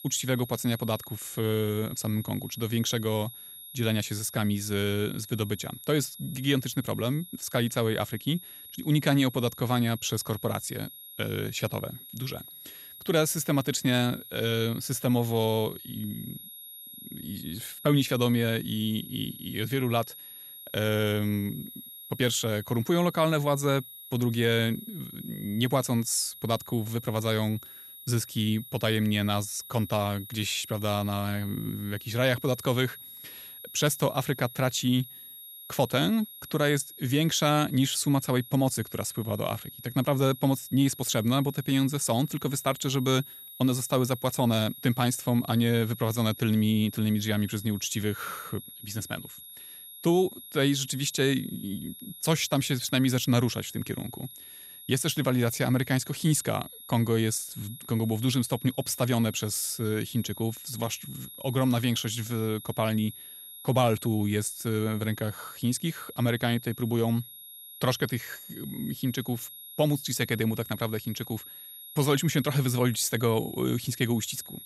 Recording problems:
high-pitched whine; noticeable; throughout; 11.5 kHz, 15 dB below the speech

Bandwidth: 14.5 kHz